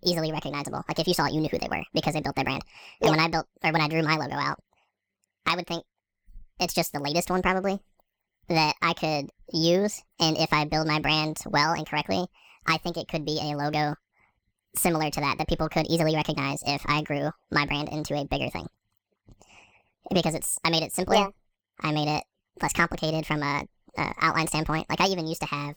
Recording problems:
wrong speed and pitch; too fast and too high; 1.6 times normal speed

